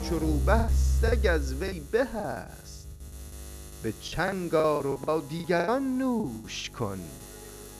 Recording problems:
background music; very loud; throughout; 1 dB above the speech
electrical hum; faint; throughout; 50 Hz, 20 dB below the speech
choppy; very; 15% of the speech affected

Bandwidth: 14.5 kHz